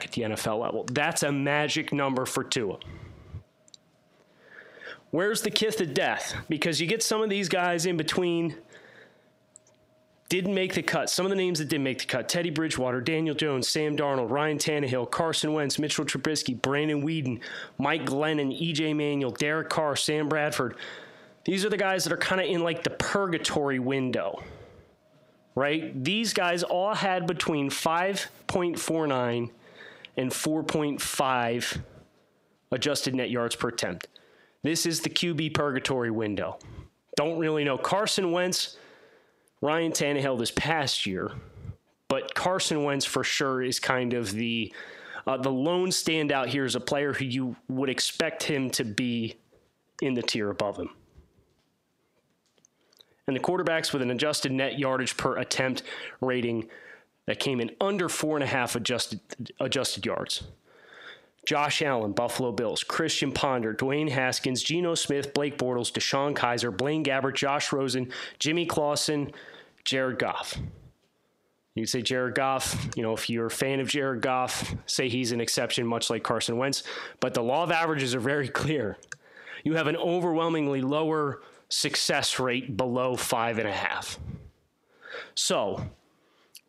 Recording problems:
squashed, flat; heavily

